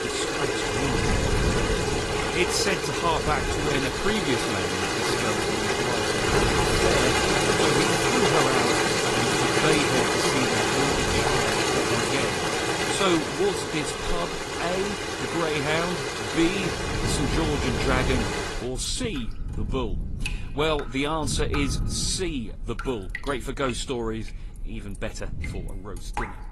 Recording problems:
garbled, watery; slightly; nothing above 11.5 kHz
rain or running water; very loud; throughout; 5 dB above the speech
wind noise on the microphone; occasional gusts; 15 dB below the speech

